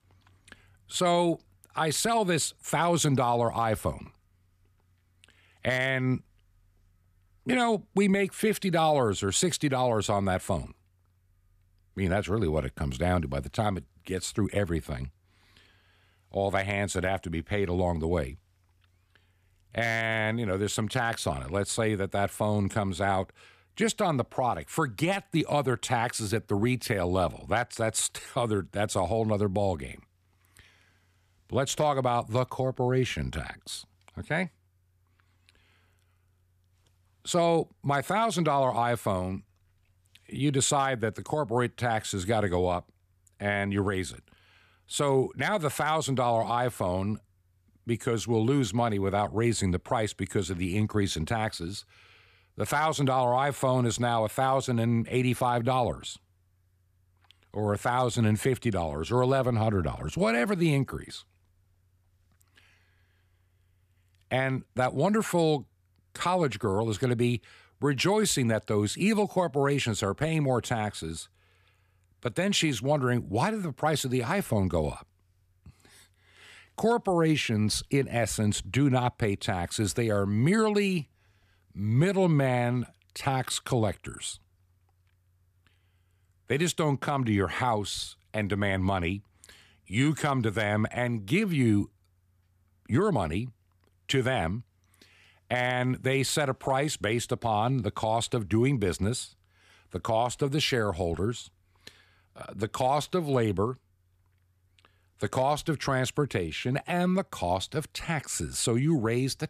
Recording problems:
none

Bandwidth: 14.5 kHz